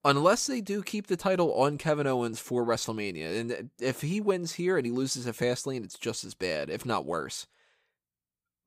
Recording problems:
none

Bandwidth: 15 kHz